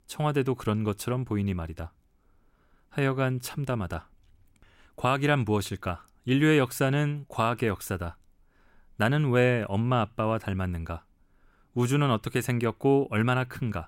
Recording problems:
none

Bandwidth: 16 kHz